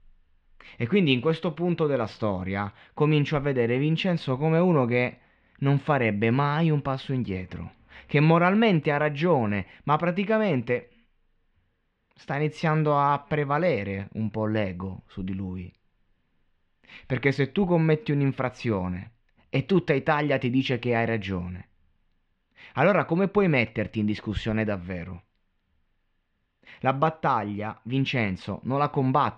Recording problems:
muffled; very; fading above 3 kHz

